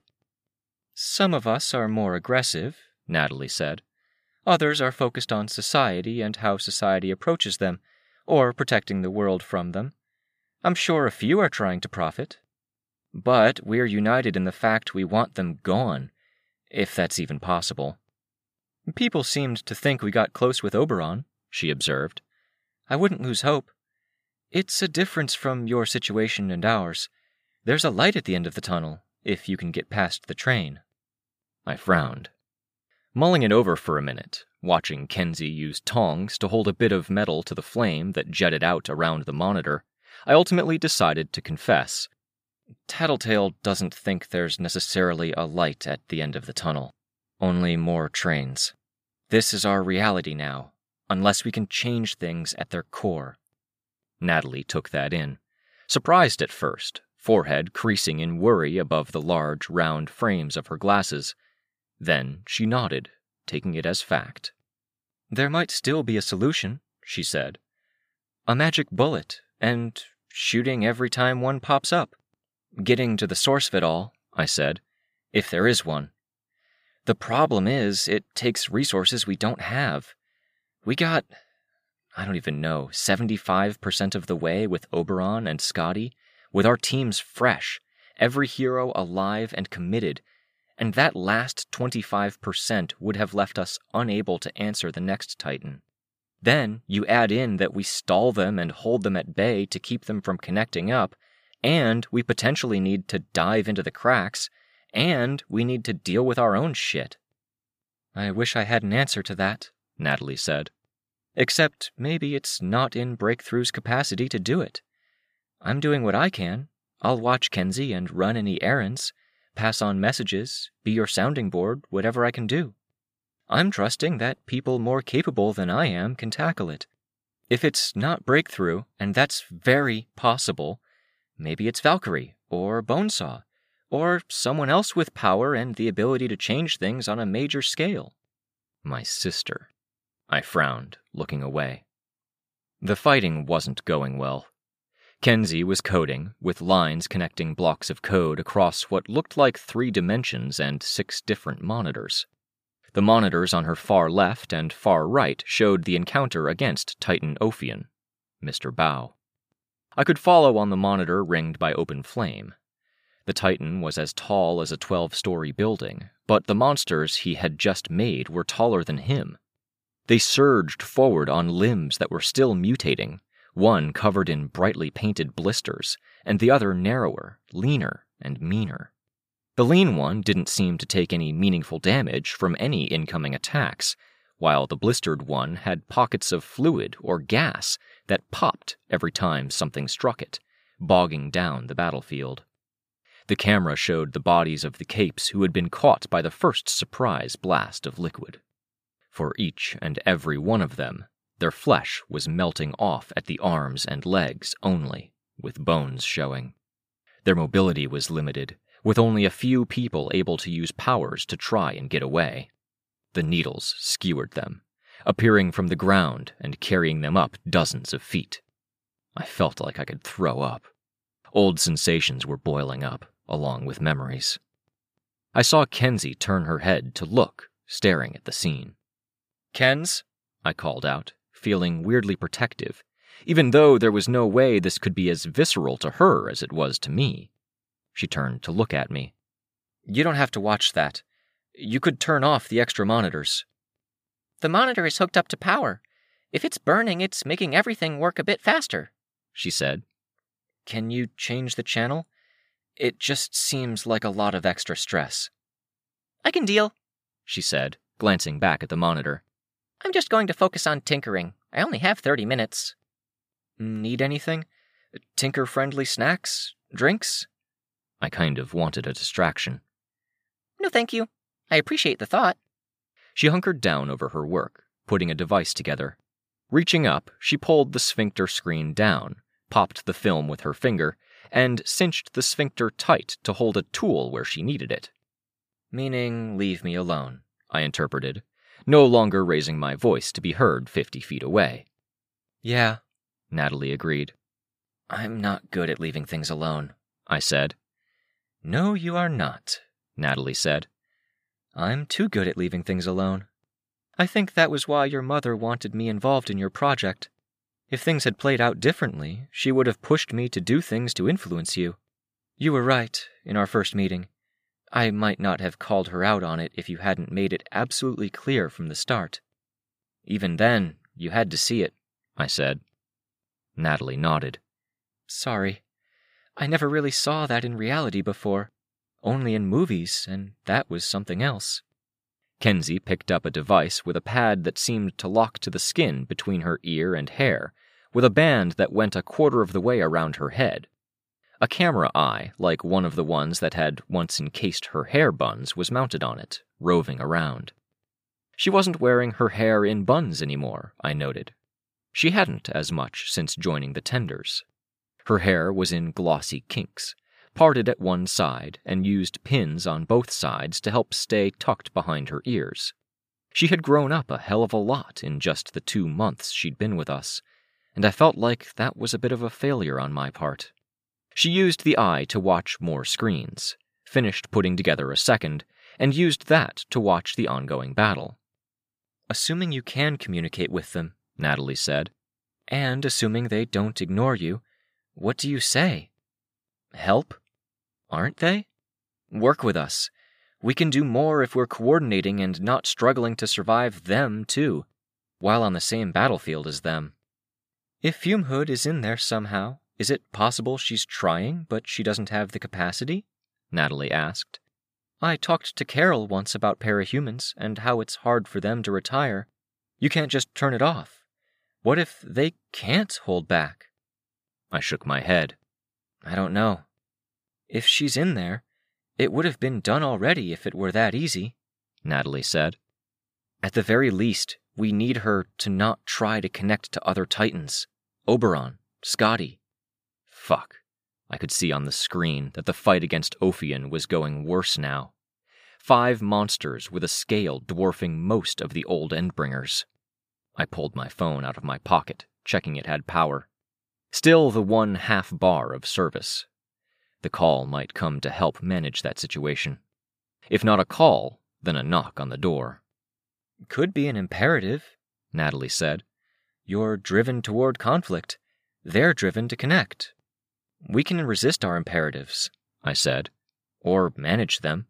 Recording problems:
none

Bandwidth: 15 kHz